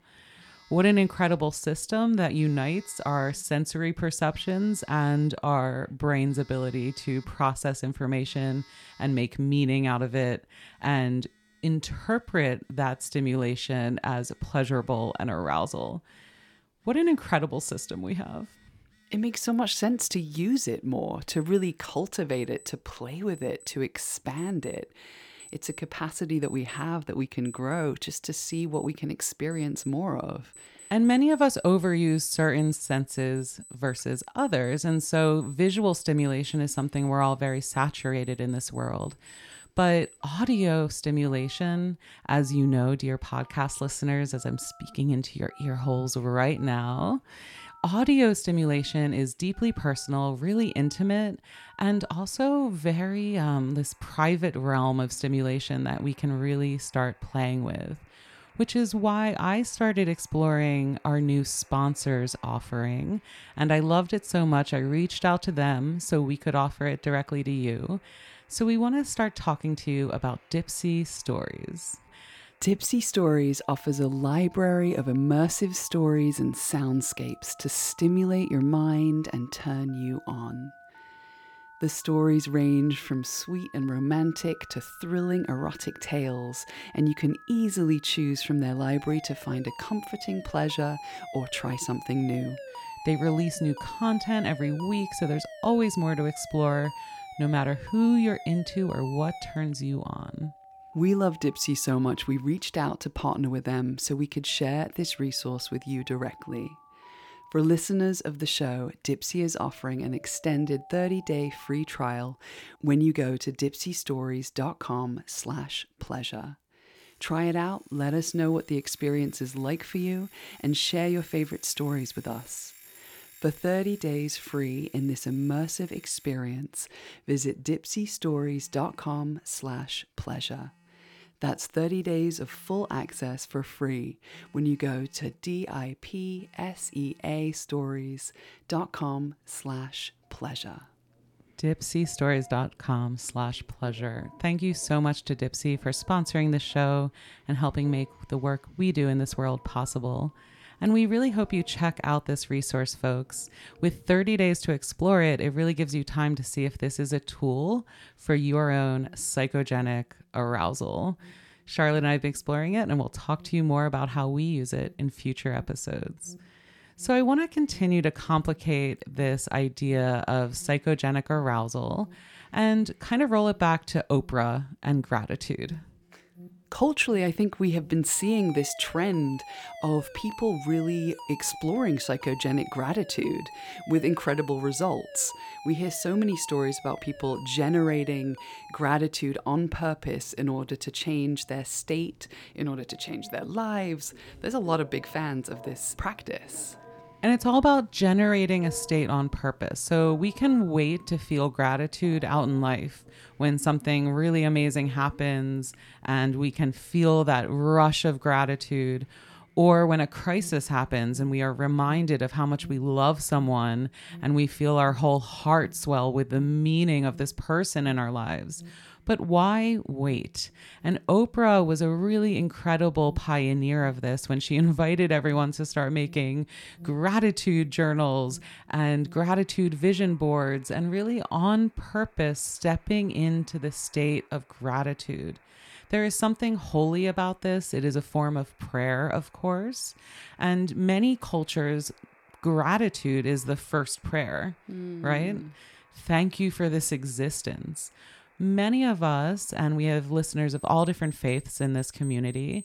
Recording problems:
alarms or sirens; faint; throughout; 20 dB below the speech

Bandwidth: 17.5 kHz